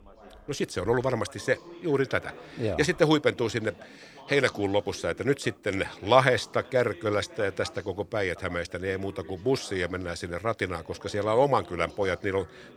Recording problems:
background chatter; faint; throughout; 2 voices, 20 dB below the speech

